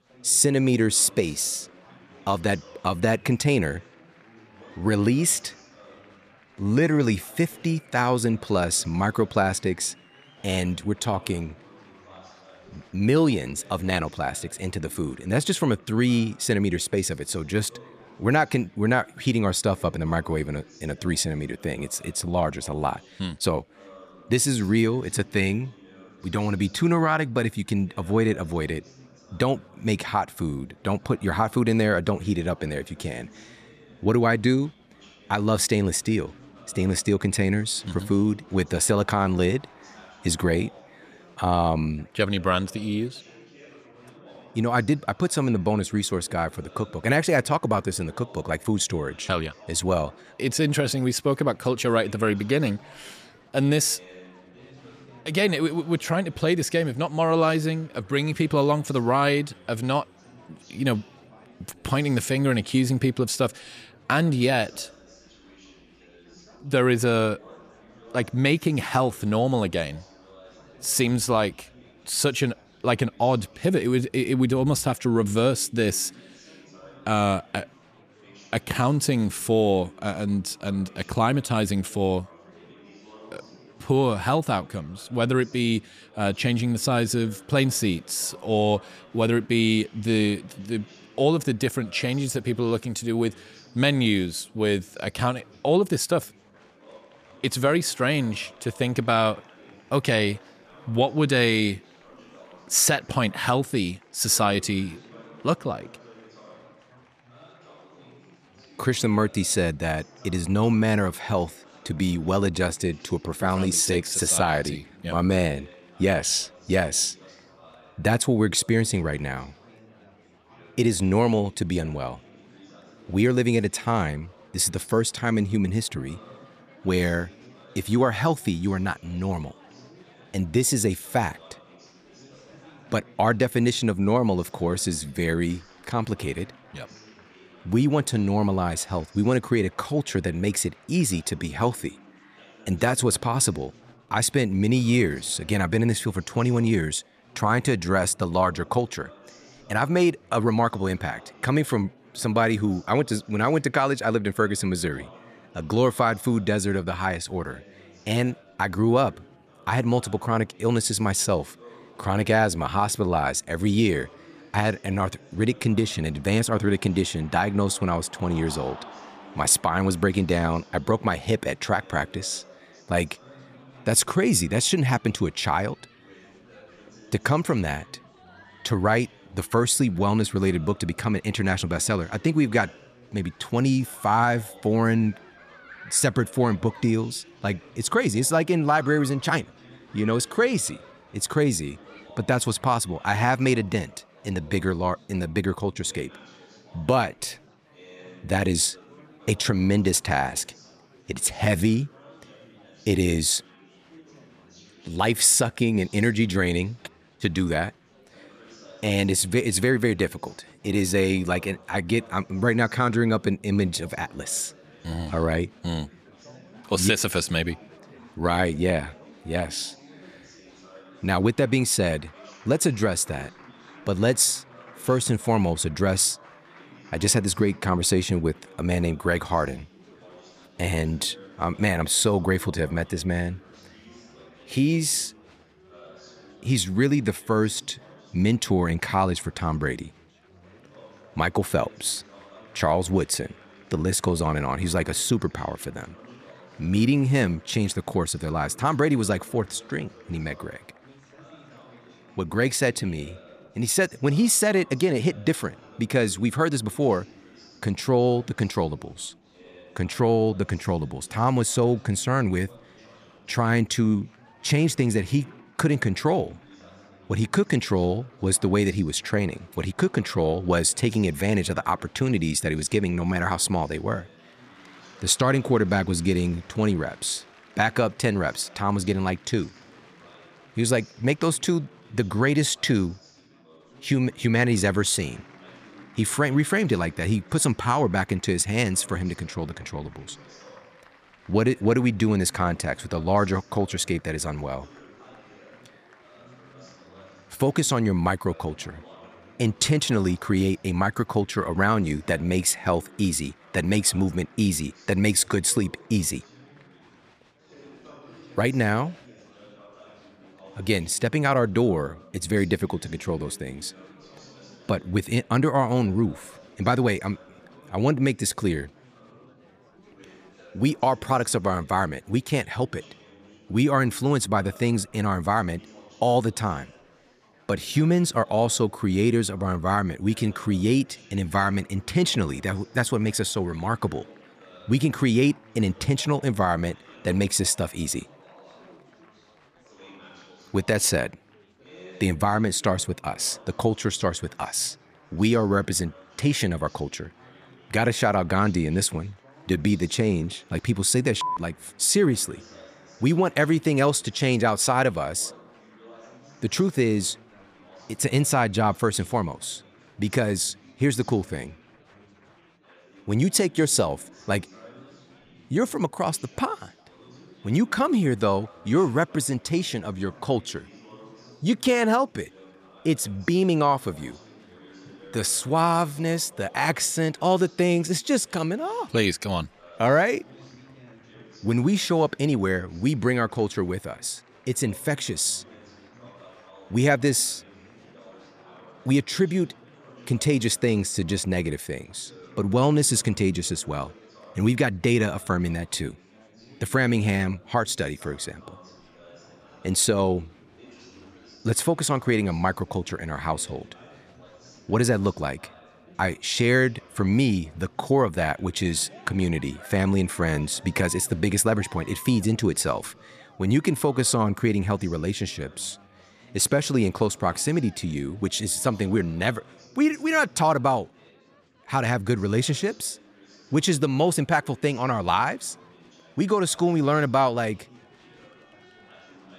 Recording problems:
chatter from many people; faint; throughout; 25 dB below the speech

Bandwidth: 14.5 kHz